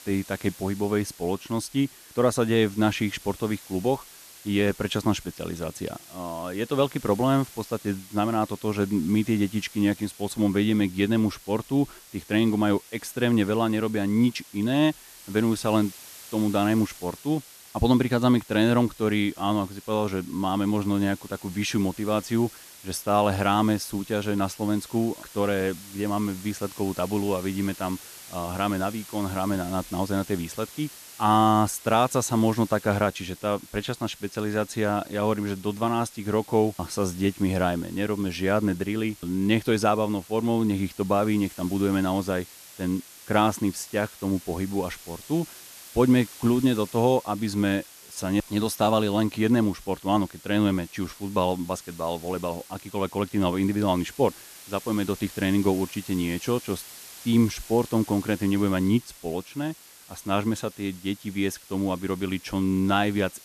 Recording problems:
hiss; noticeable; throughout; 20 dB below the speech

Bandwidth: 14 kHz